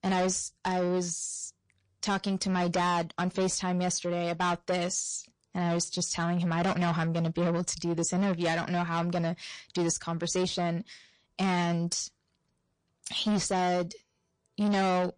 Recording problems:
distortion; heavy; 8 dB below the speech
garbled, watery; slightly; nothing above 9 kHz

